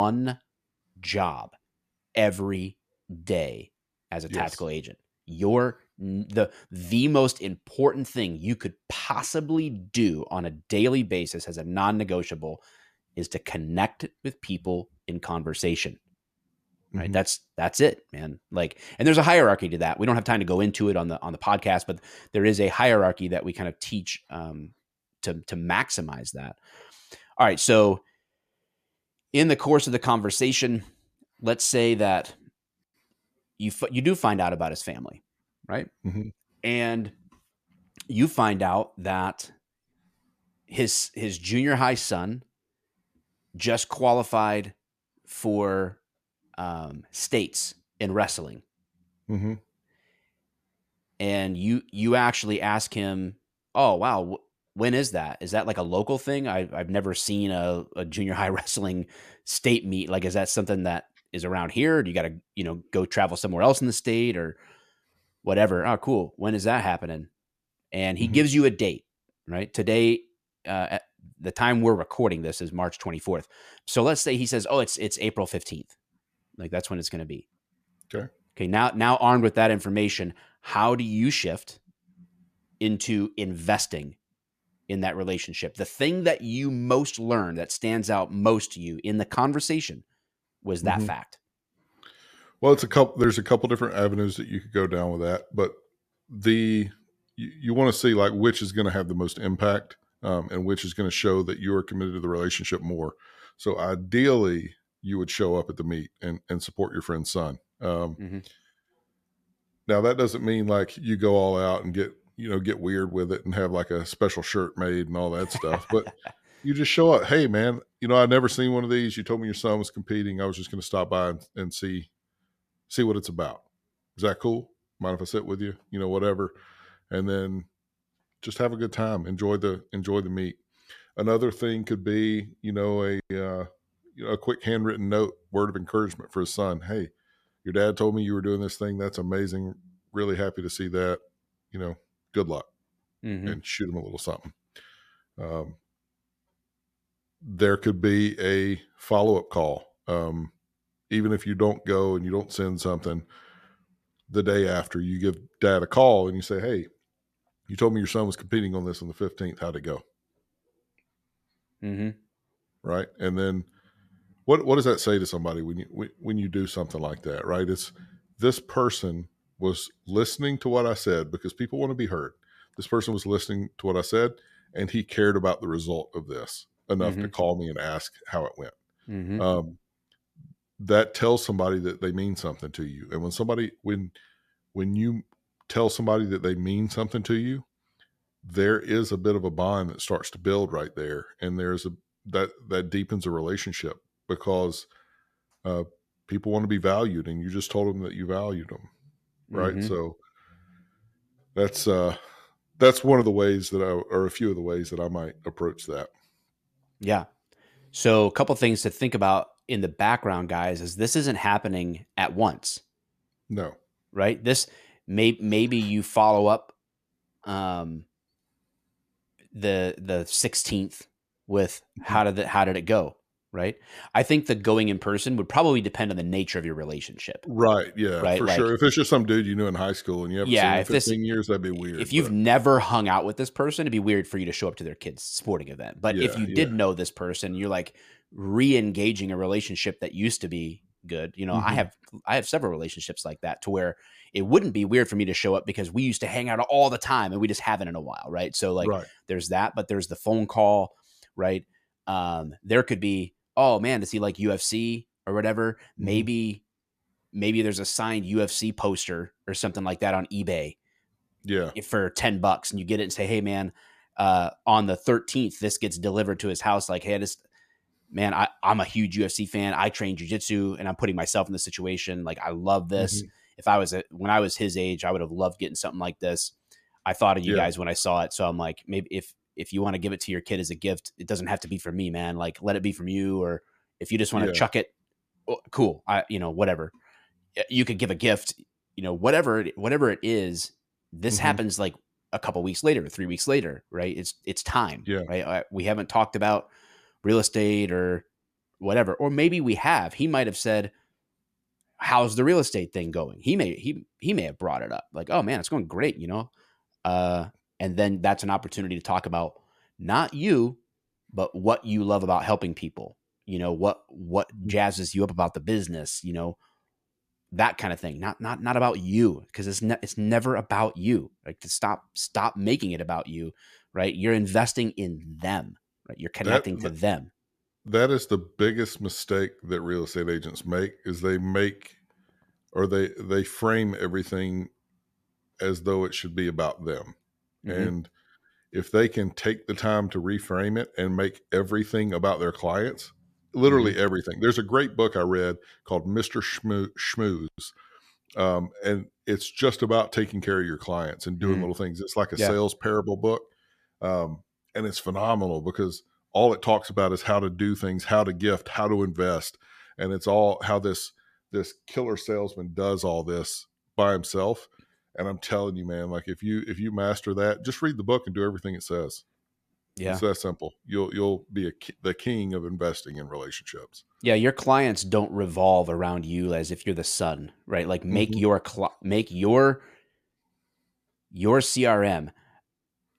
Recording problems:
abrupt cut into speech; at the start

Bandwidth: 14.5 kHz